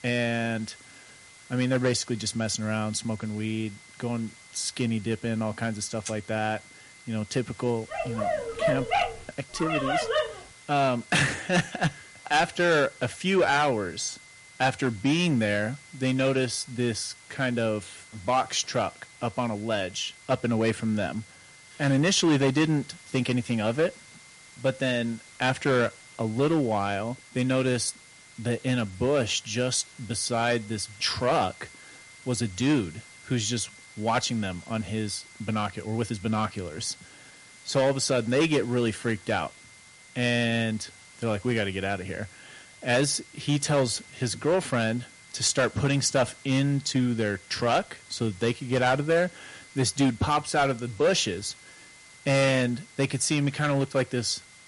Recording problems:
distortion; slight; 3% of the sound clipped
garbled, watery; slightly; nothing above 11 kHz
high-pitched whine; faint; throughout; 2 kHz, 25 dB below the speech
hiss; faint; throughout; 25 dB below the speech
dog barking; loud; from 8 to 10 s; peak 2 dB above the speech

